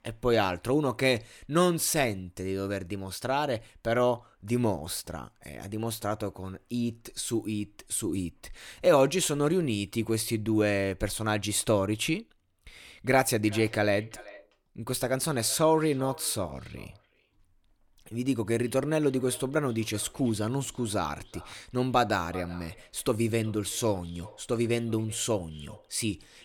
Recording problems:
echo of what is said; faint; from 13 s on; 380 ms later, 20 dB below the speech

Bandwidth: 18 kHz